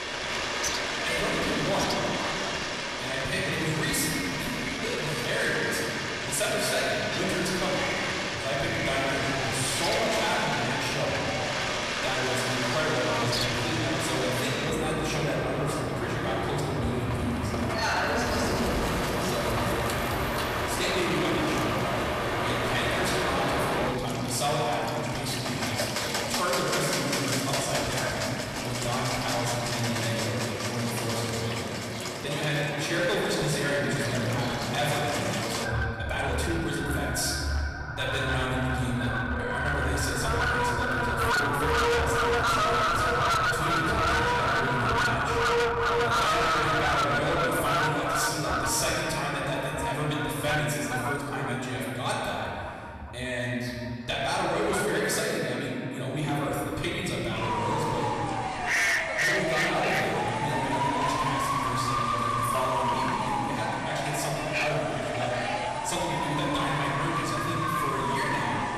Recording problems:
distortion; heavy; 14% of the sound clipped
off-mic speech; far
room echo; noticeable; dies away in 2.5 s
animal sounds; very loud; throughout; 1 dB above the speech
uneven, jittery; strongly; from 4 to 37 s

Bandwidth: 13.5 kHz